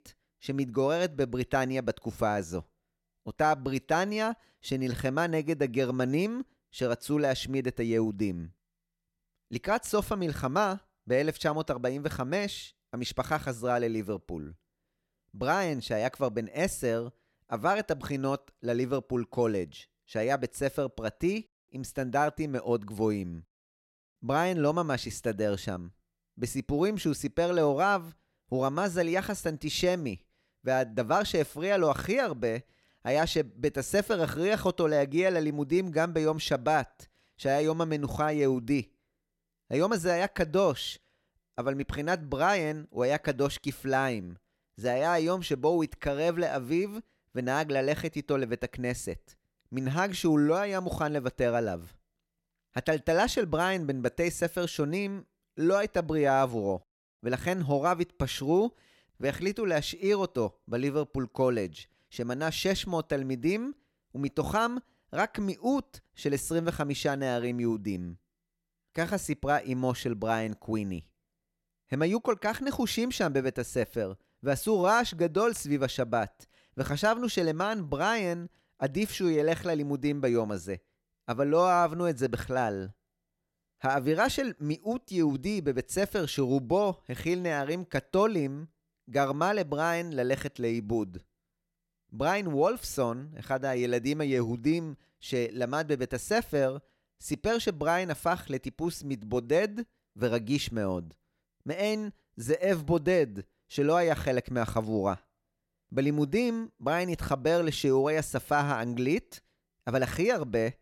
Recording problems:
none

